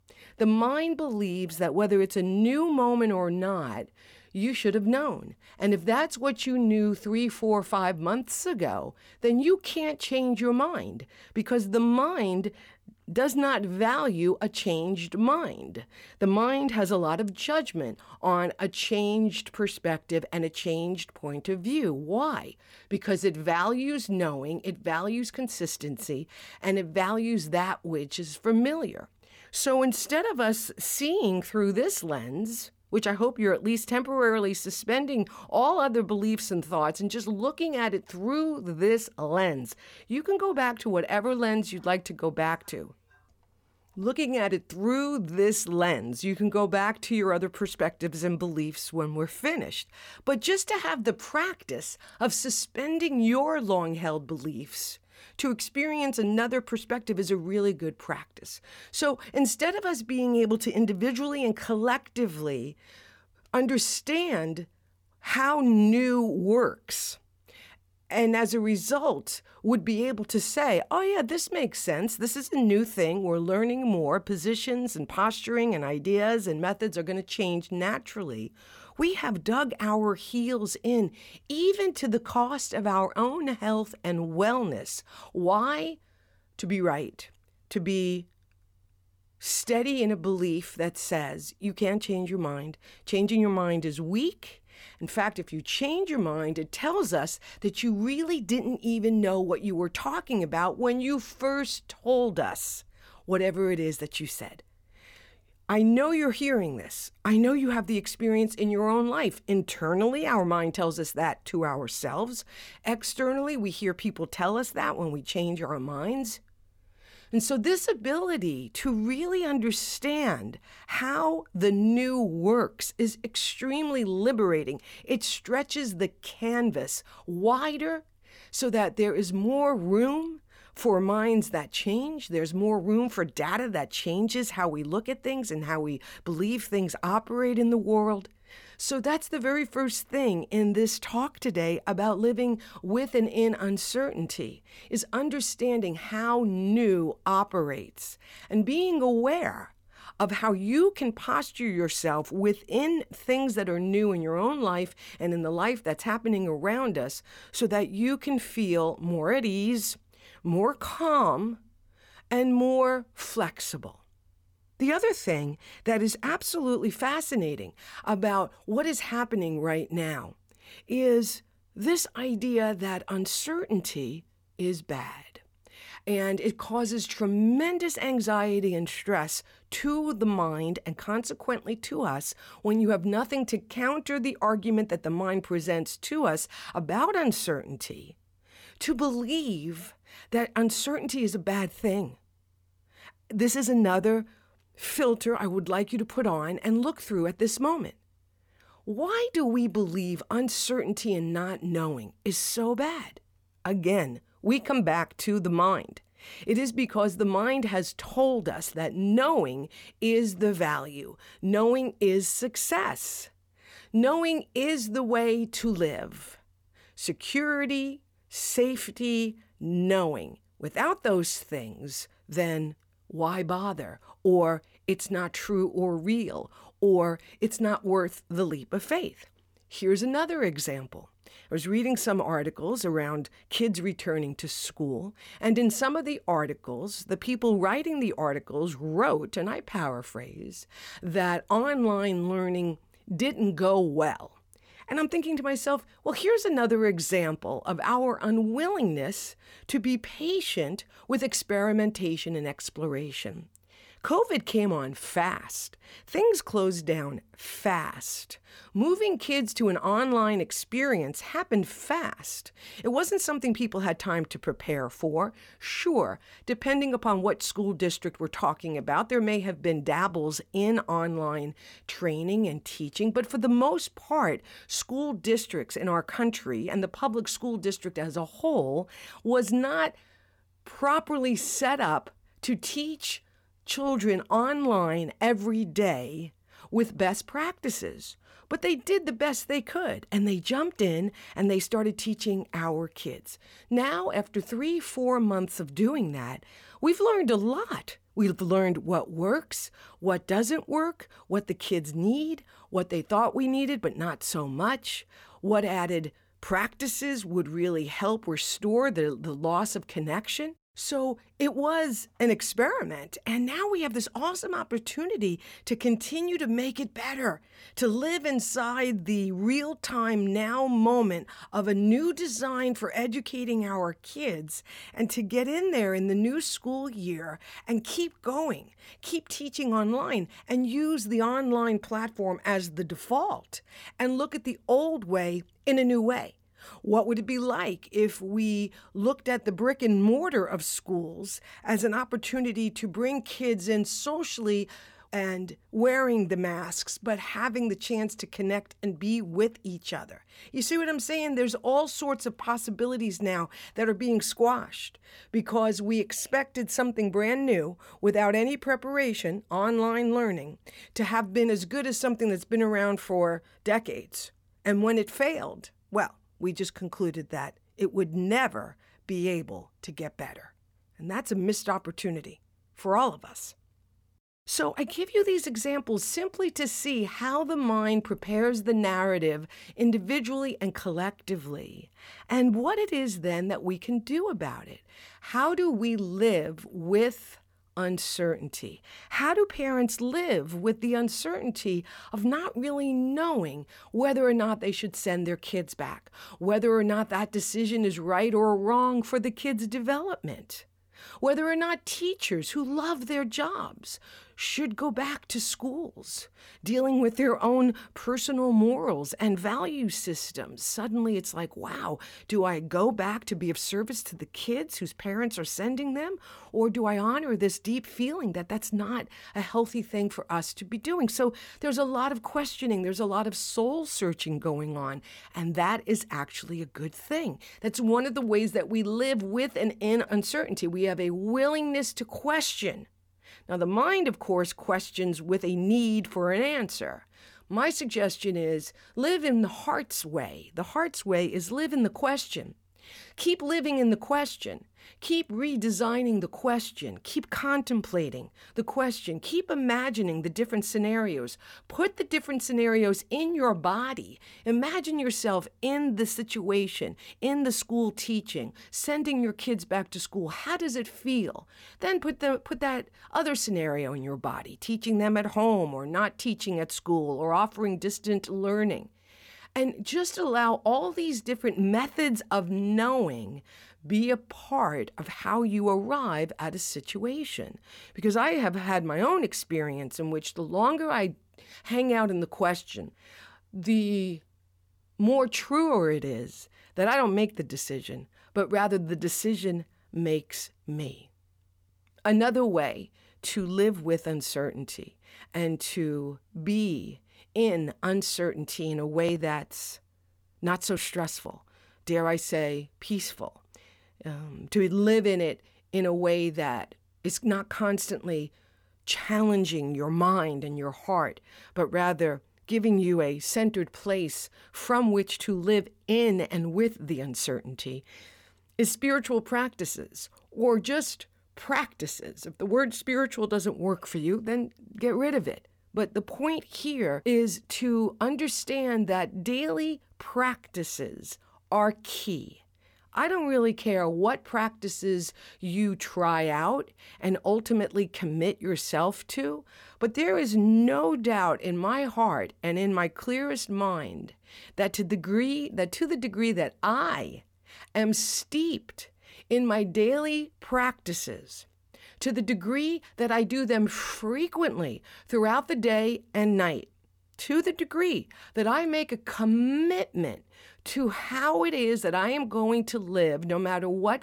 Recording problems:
none

